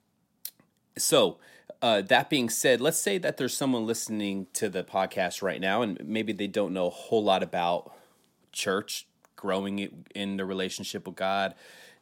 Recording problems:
none

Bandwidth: 16 kHz